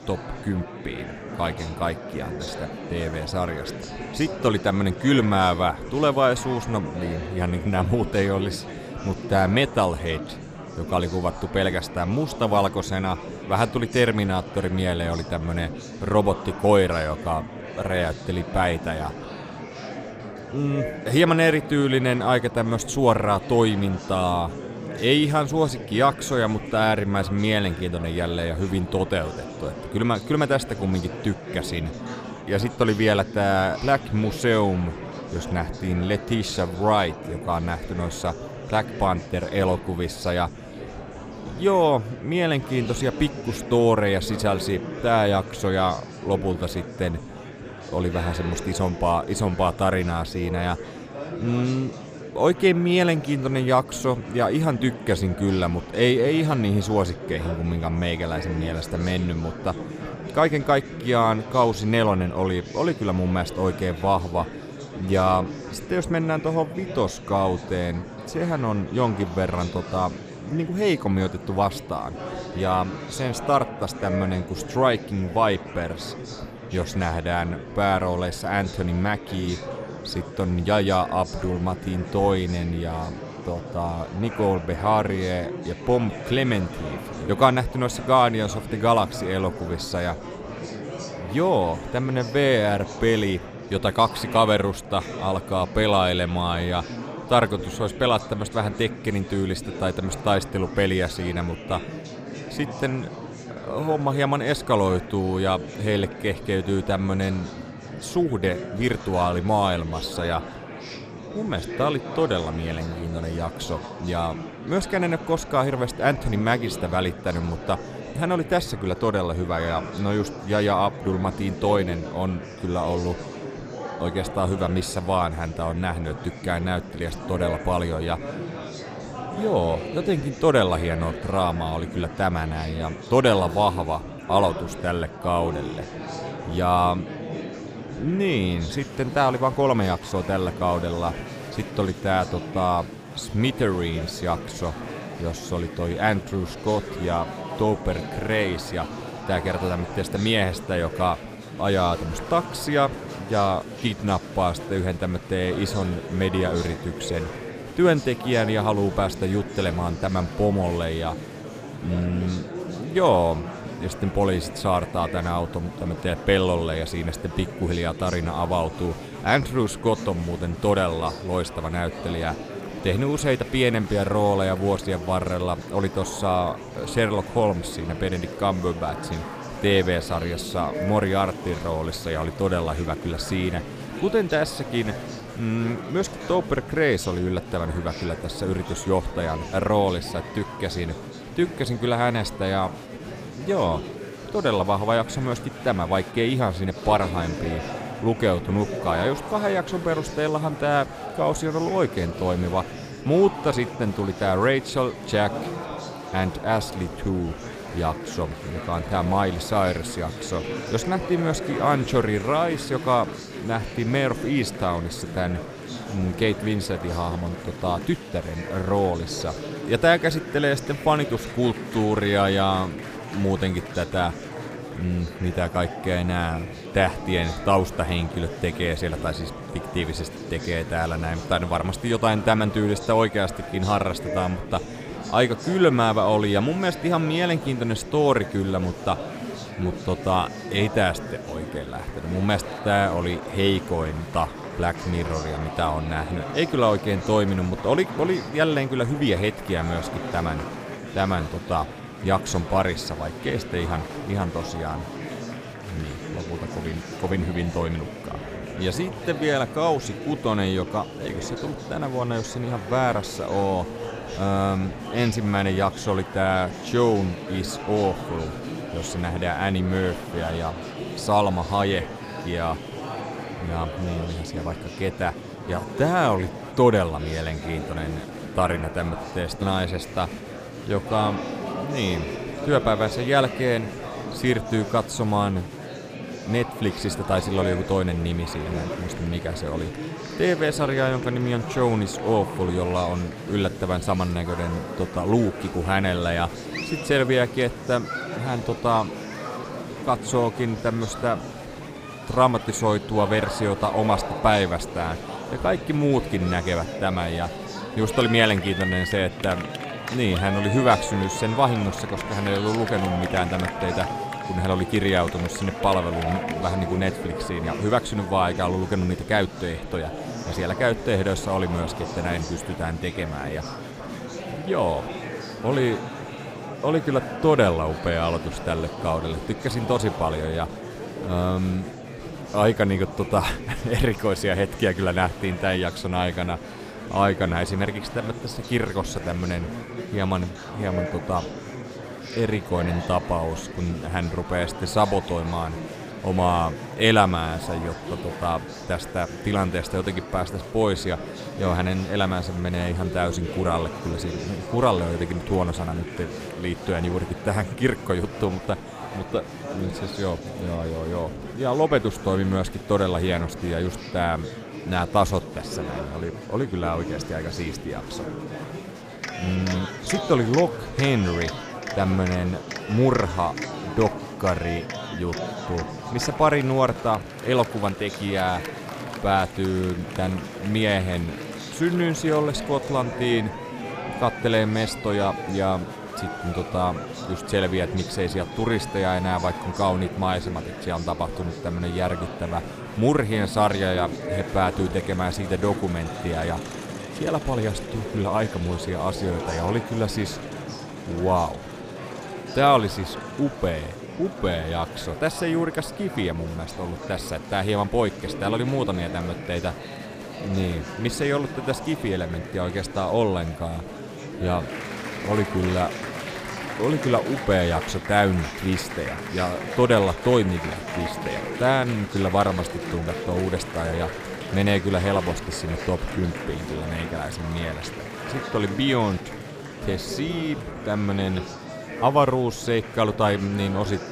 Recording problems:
murmuring crowd; loud; throughout; 10 dB below the speech

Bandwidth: 15 kHz